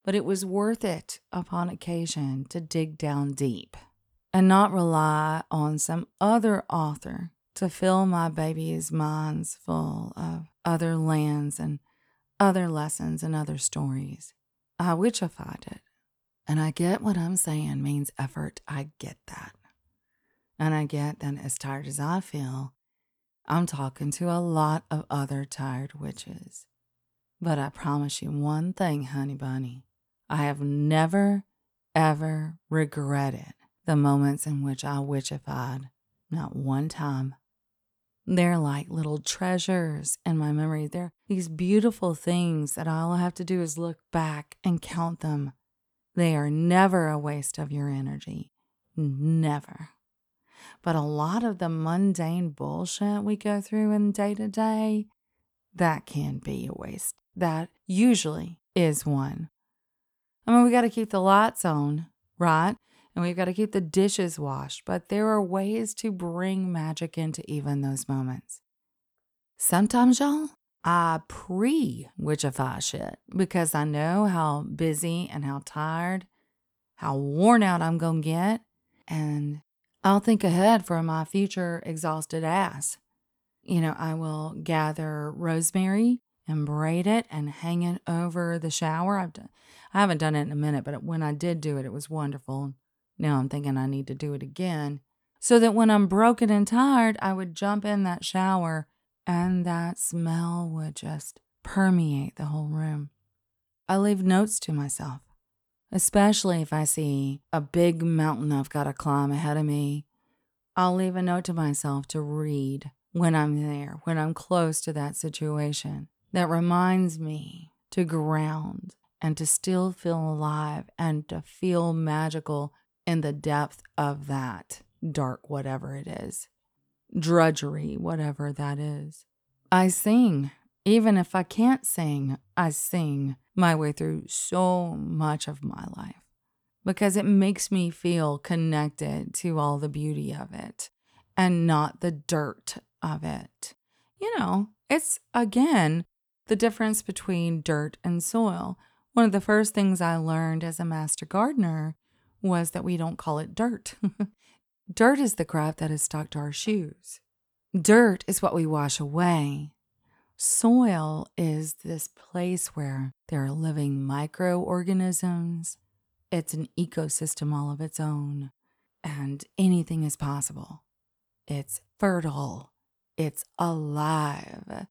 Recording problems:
none

